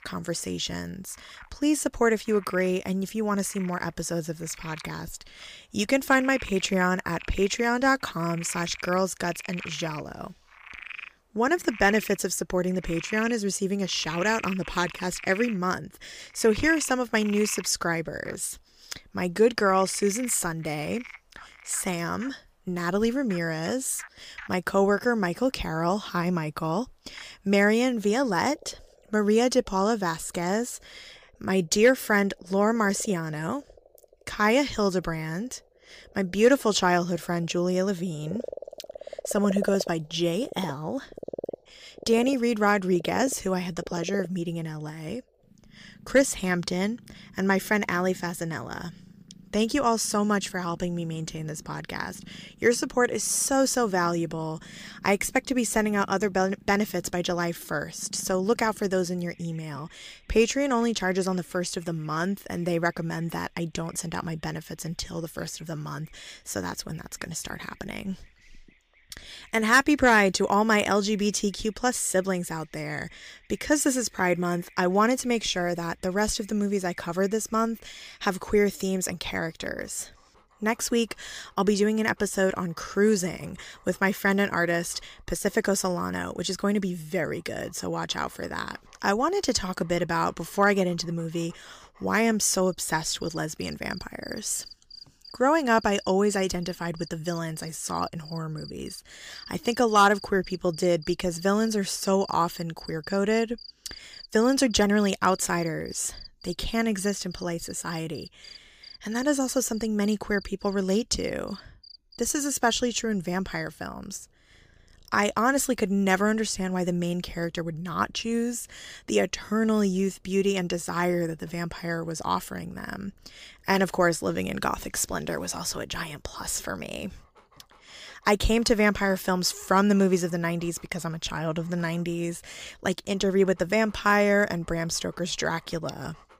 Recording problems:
animal sounds; noticeable; throughout; 20 dB below the speech

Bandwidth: 15 kHz